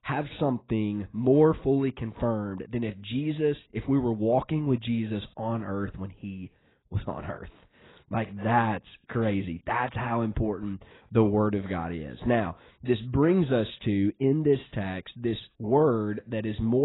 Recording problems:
garbled, watery; badly; nothing above 4 kHz
abrupt cut into speech; at the end

